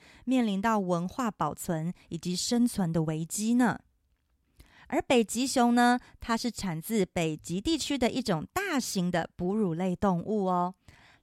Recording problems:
none

